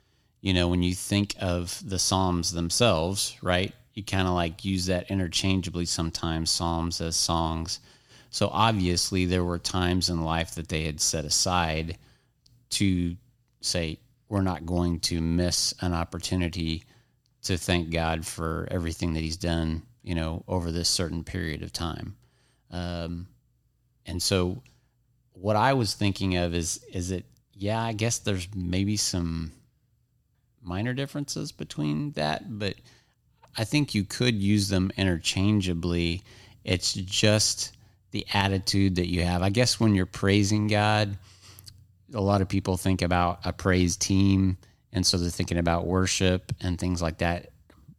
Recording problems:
none

